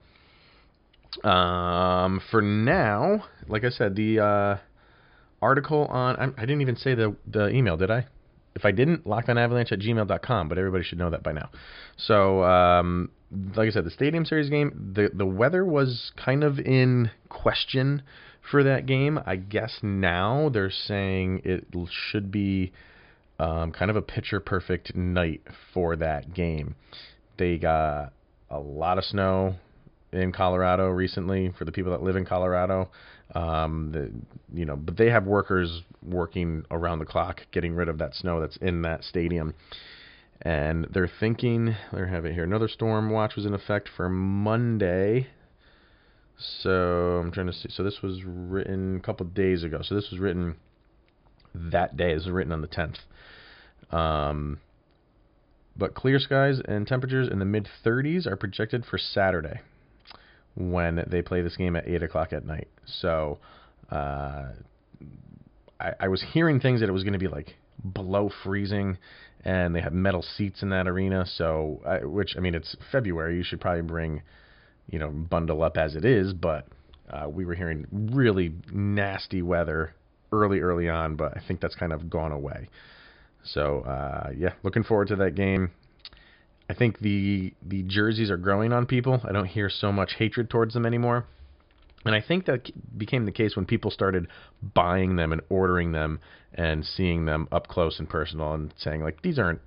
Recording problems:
high frequencies cut off; noticeable; nothing above 5 kHz

